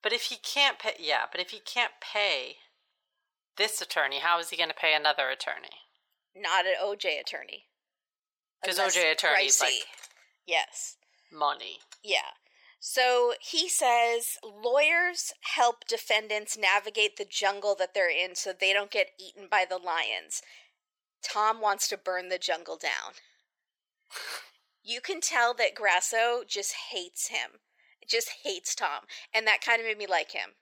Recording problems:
thin; very; fading below 550 Hz

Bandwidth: 17.5 kHz